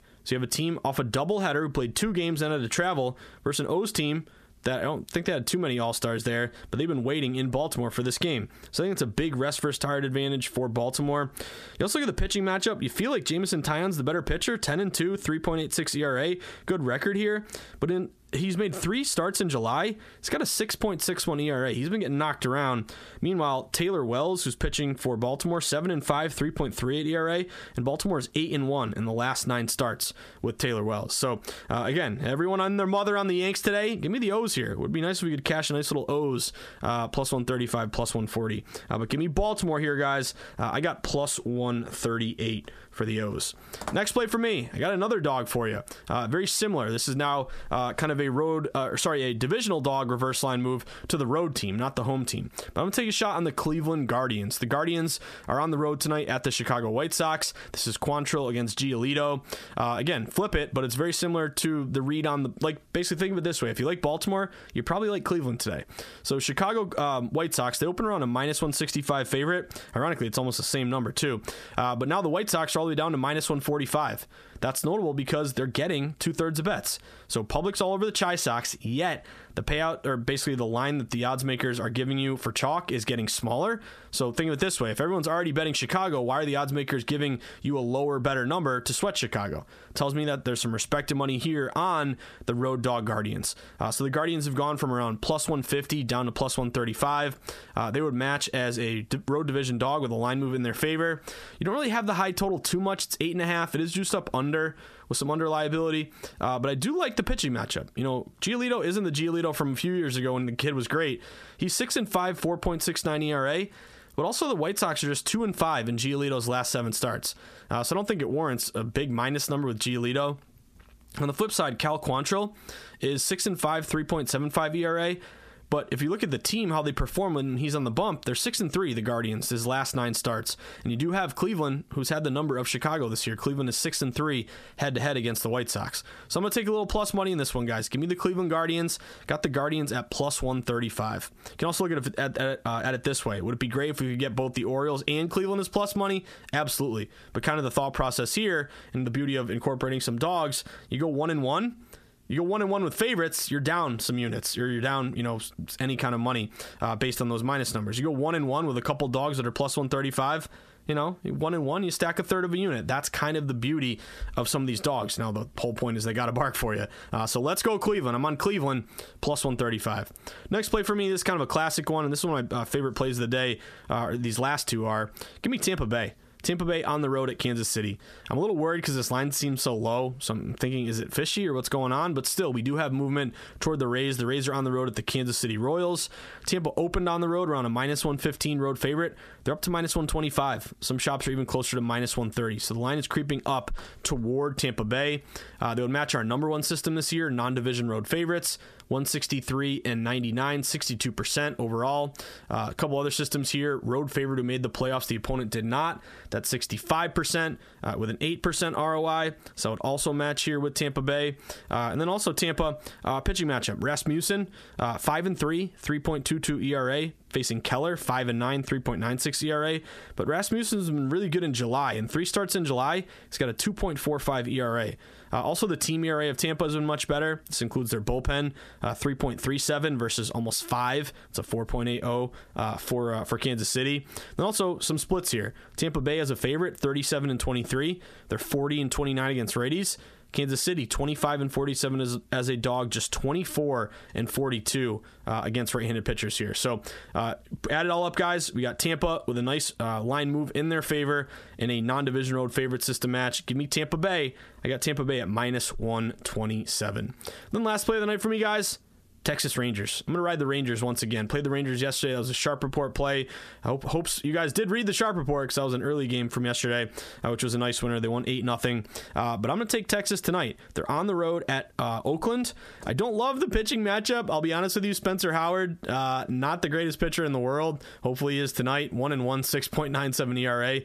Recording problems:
squashed, flat; heavily

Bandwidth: 14.5 kHz